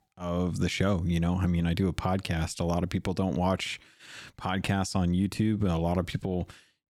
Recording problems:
none

